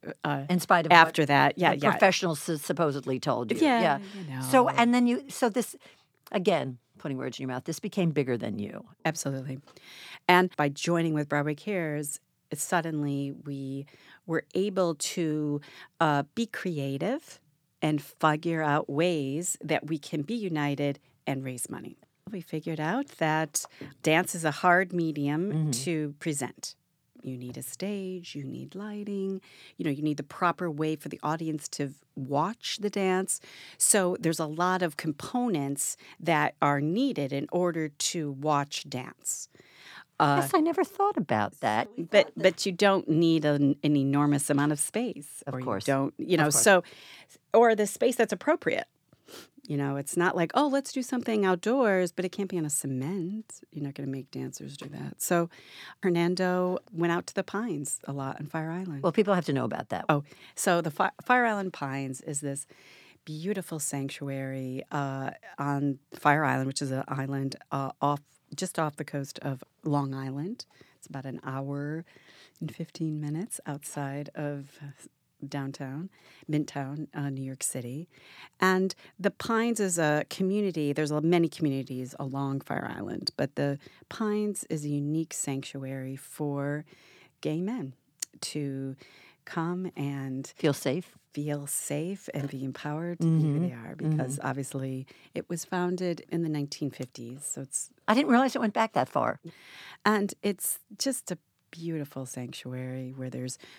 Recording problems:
none

